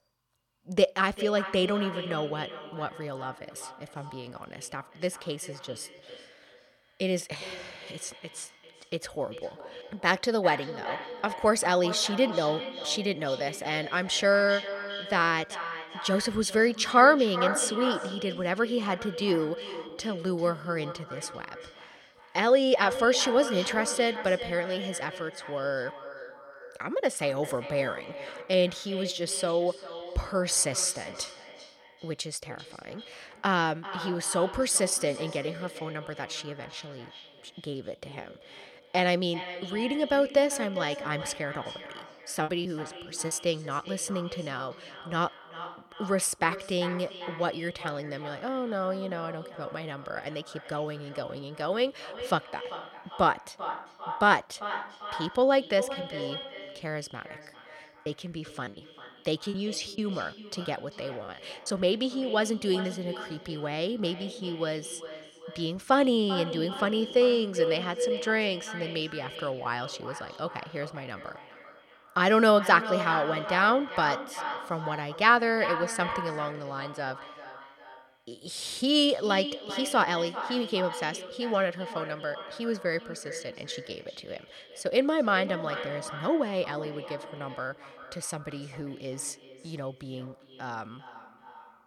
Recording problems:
echo of what is said; strong; throughout; 390 ms later, 10 dB below the speech
choppy; very; from 42 to 44 s and from 58 s to 1:02; 13% of the speech affected

